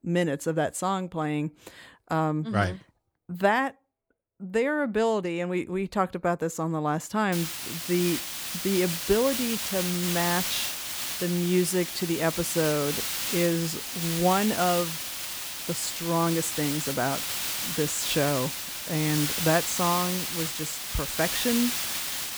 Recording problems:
hiss; loud; from 7.5 s on; 2 dB below the speech

